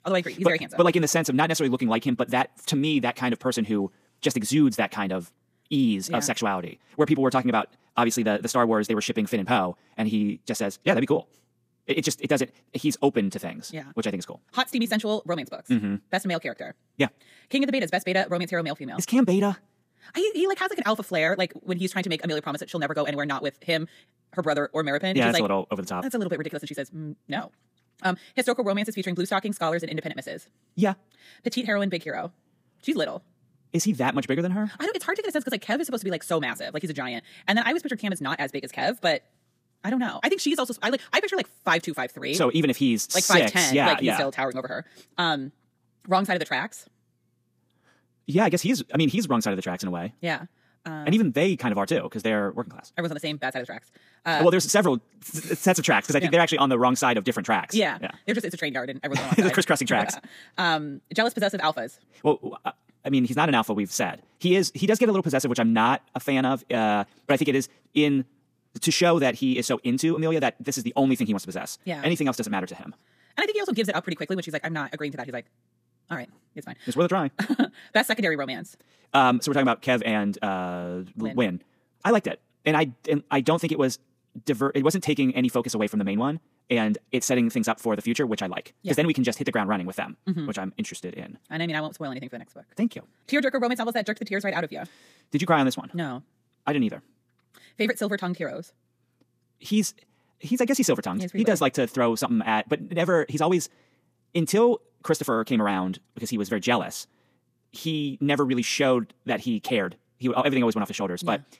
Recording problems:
wrong speed, natural pitch; too fast; 1.8 times normal speed

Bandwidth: 15 kHz